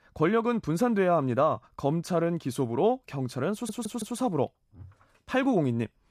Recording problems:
audio stuttering; at 3.5 s

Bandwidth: 14.5 kHz